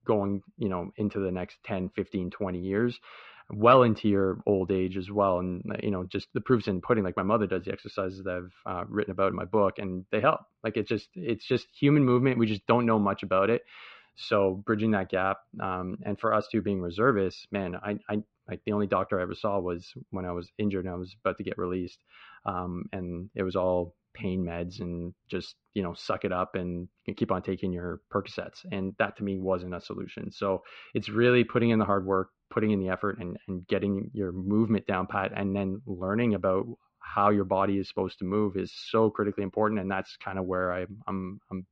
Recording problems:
muffled; slightly; fading above 3.5 kHz

